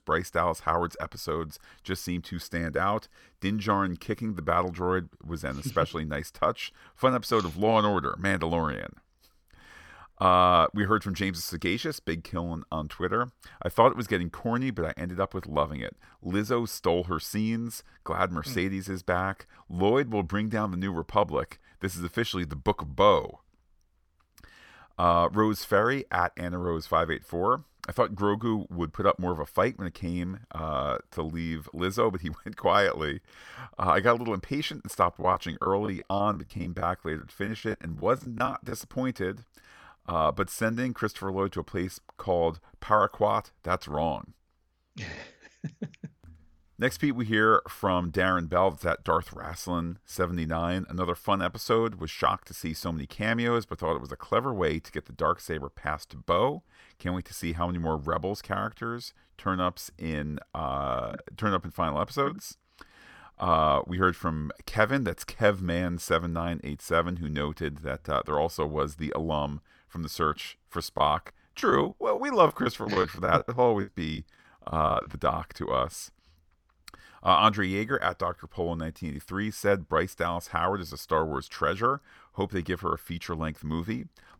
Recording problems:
choppy; very; from 35 to 39 s and from 1:11 to 1:15; 15% of the speech affected

